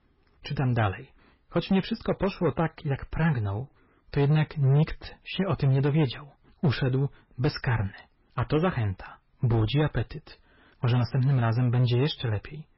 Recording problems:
garbled, watery; badly; nothing above 5.5 kHz
distortion; slight; 7% of the sound clipped

